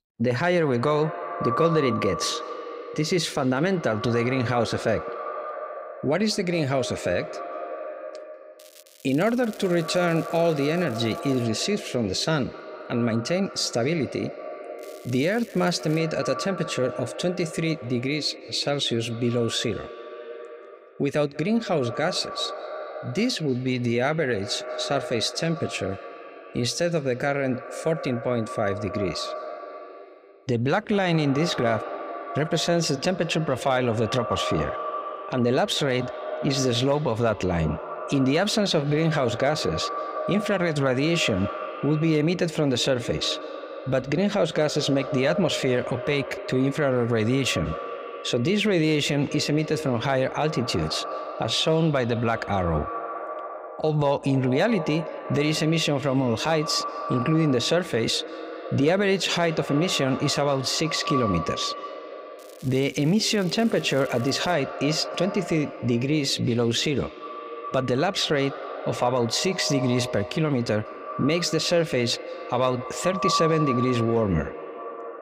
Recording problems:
echo of what is said; strong; throughout; 190 ms later, 10 dB below the speech
crackling; faint; from 8.5 to 11 s, from 15 to 16 s and from 1:02 to 1:05; 25 dB below the speech

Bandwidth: 15.5 kHz